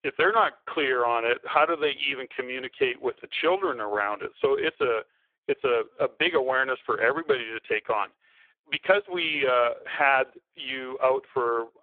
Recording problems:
phone-call audio; poor line

